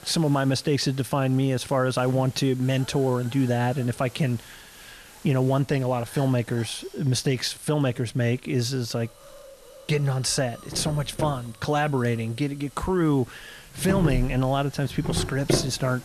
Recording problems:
household noises; loud; throughout; 6 dB below the speech
hiss; faint; throughout; 20 dB below the speech

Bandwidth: 13.5 kHz